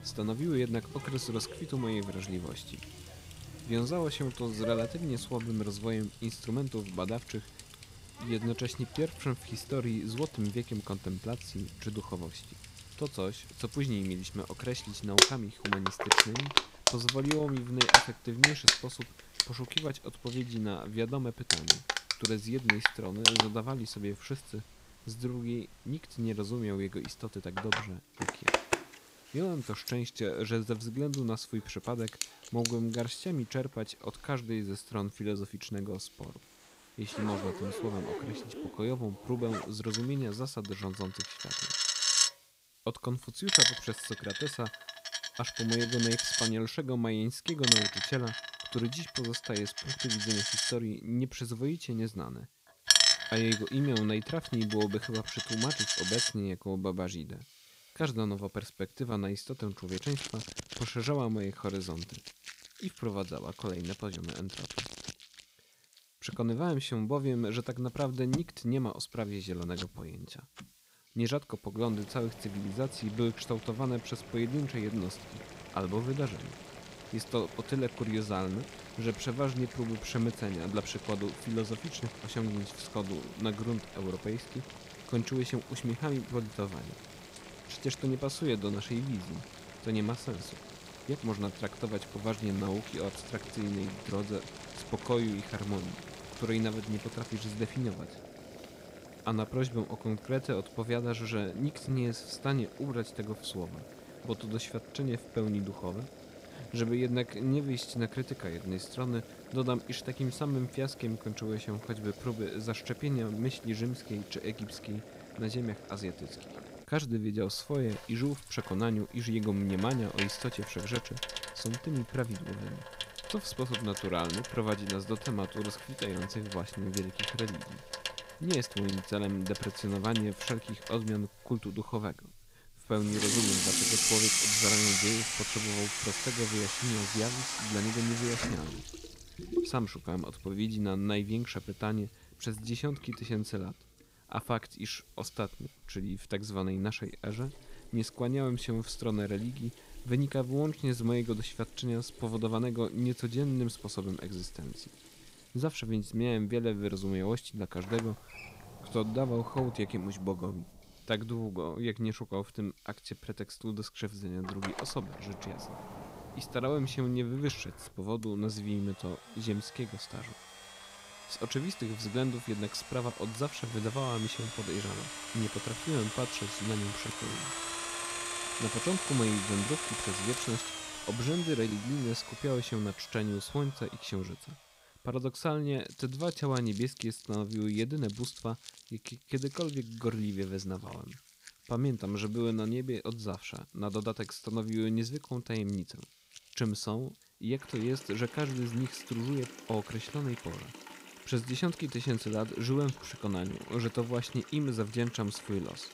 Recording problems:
household noises; very loud; throughout; 3 dB above the speech
hiss; faint; throughout; 25 dB below the speech

